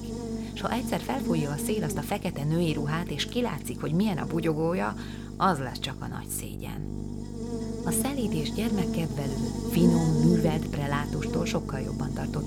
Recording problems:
electrical hum; loud; throughout; 50 Hz, 6 dB below the speech

